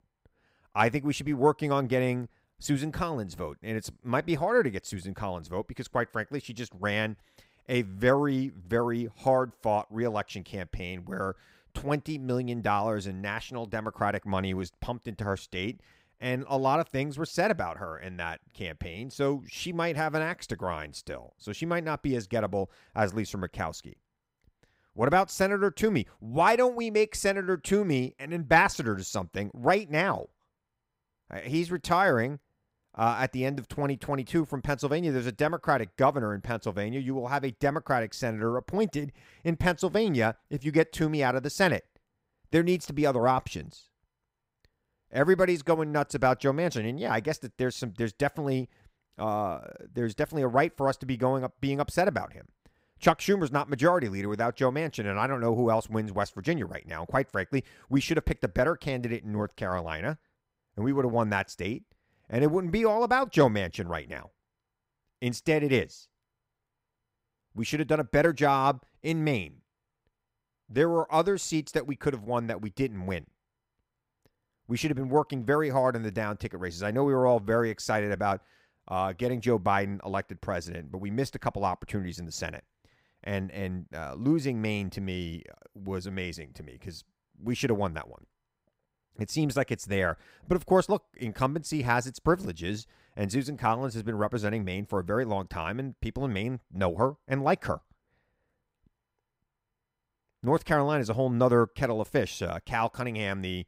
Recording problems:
none

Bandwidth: 15.5 kHz